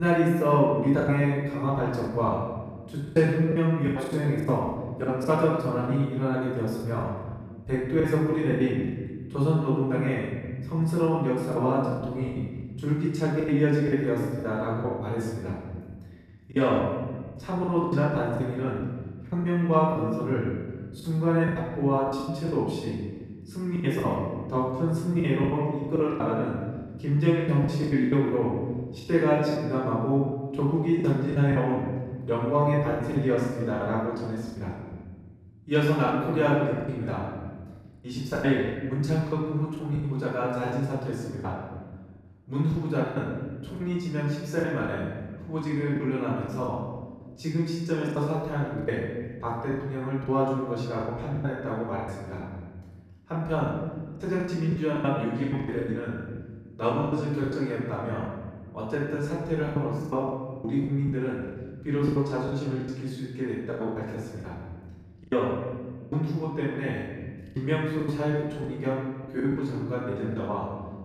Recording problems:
off-mic speech; far
room echo; noticeable; dies away in 1.4 s
choppy; very; 13% of the speech affected
abrupt cut into speech; at the start

